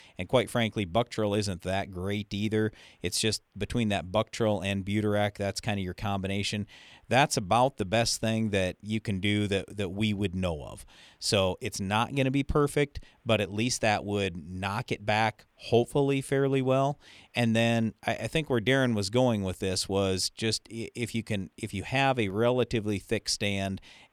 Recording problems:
none

